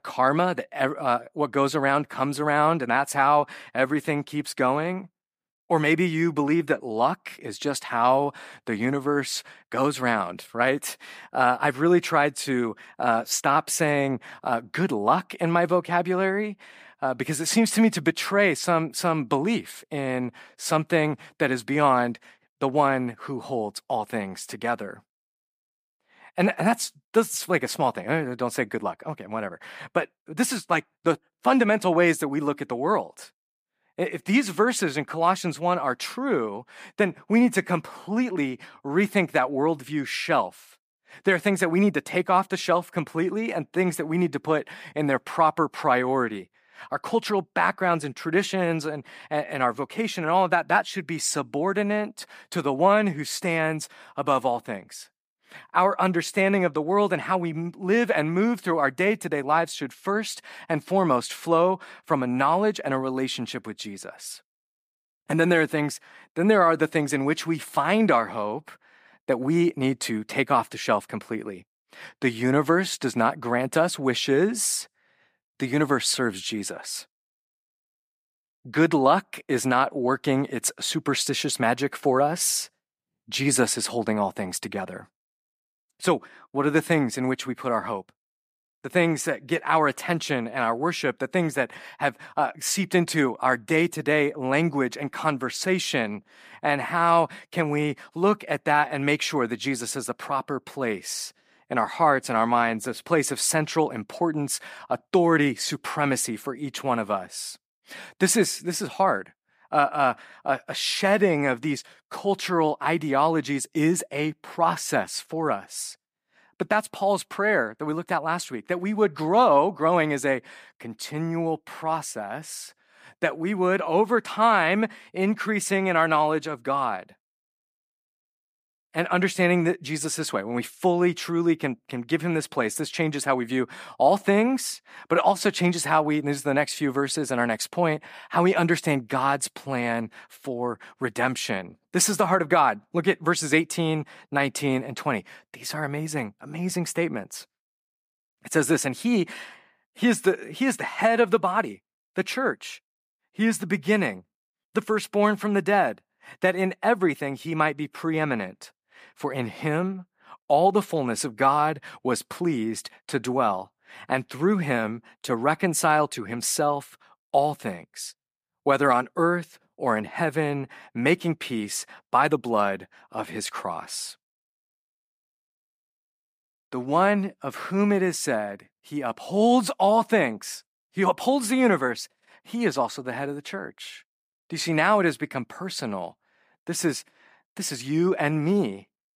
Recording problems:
none

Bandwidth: 15 kHz